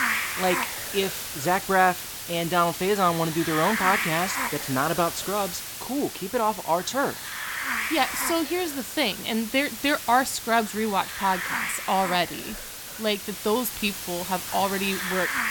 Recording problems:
hiss; loud; throughout; 5 dB below the speech

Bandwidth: 17.5 kHz